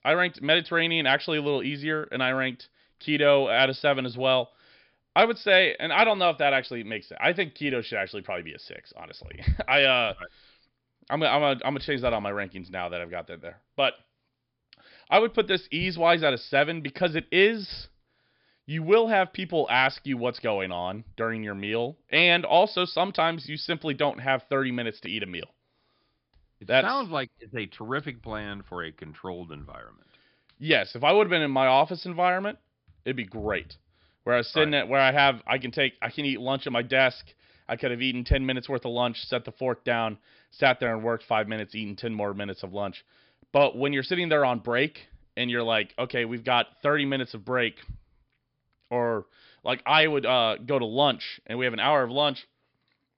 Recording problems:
high frequencies cut off; noticeable; nothing above 5 kHz

